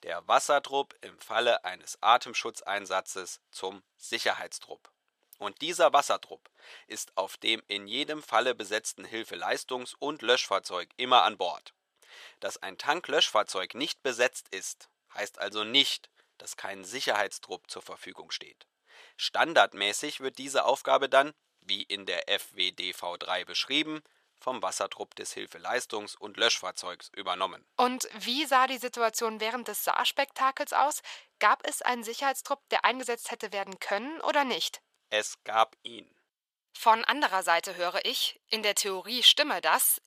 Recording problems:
thin; very; fading below 800 Hz

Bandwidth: 15 kHz